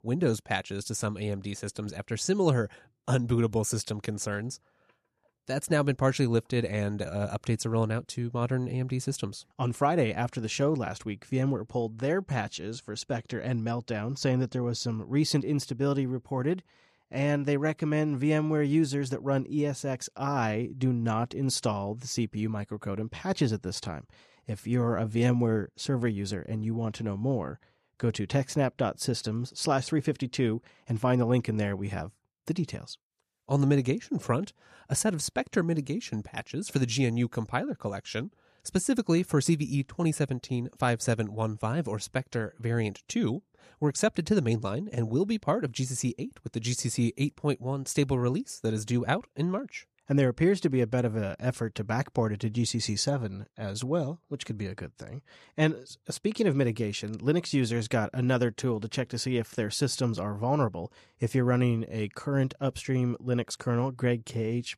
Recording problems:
none

